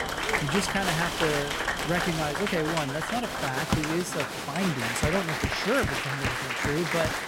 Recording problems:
echo of what is said; very faint; throughout; 130 ms later, 25 dB below the speech
crowd noise; very loud; throughout; 1 dB above the speech
machinery noise; loud; throughout; 7 dB below the speech

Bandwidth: 16 kHz